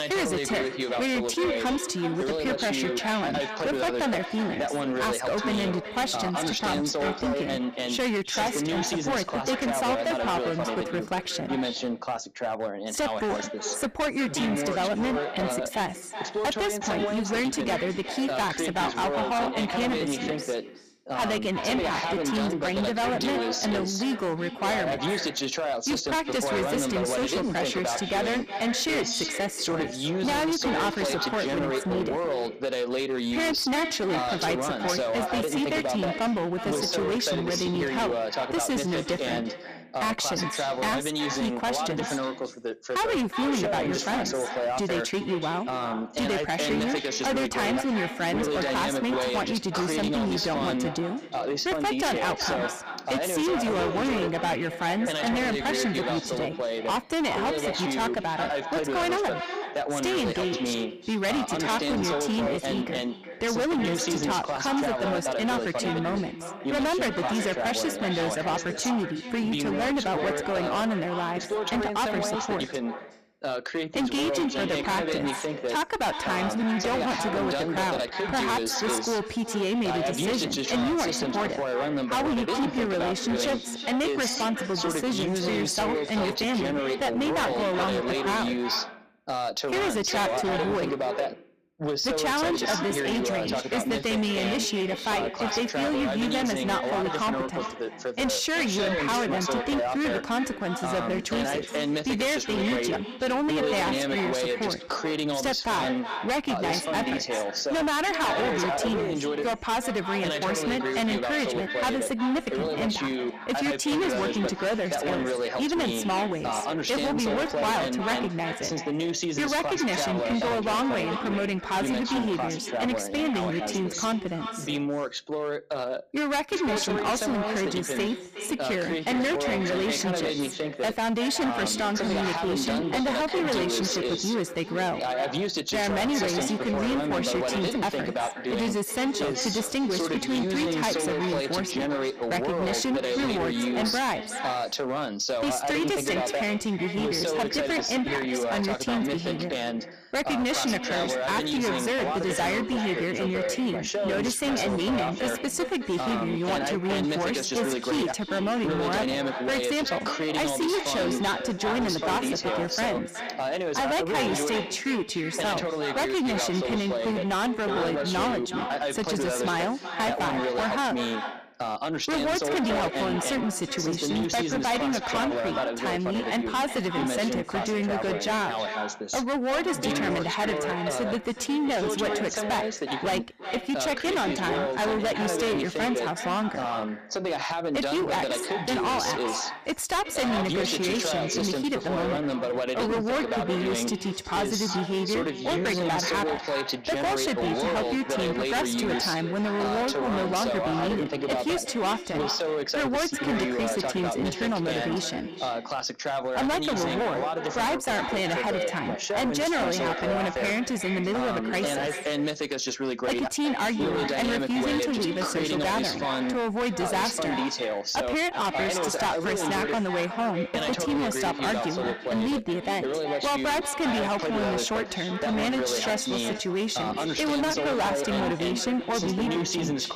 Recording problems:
distortion; heavy; 23% of the sound clipped
echo of what is said; strong; throughout; 370 ms later, 8 dB below the speech
voice in the background; loud; throughout; 2 dB below the speech

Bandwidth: 15 kHz